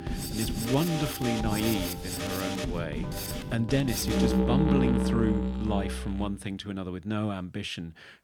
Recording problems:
background music; very loud; throughout; 1 dB above the speech

